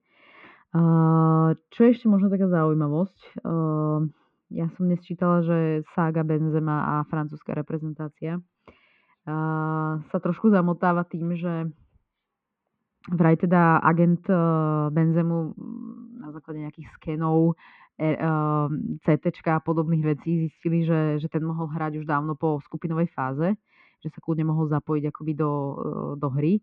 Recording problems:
muffled; very; fading above 2.5 kHz

